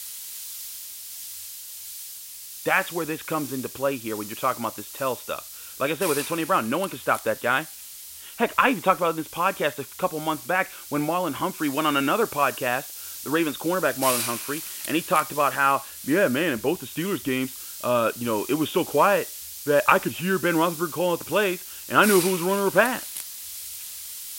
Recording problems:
high frequencies cut off; severe; nothing above 4 kHz
hiss; loud; throughout; 10 dB below the speech

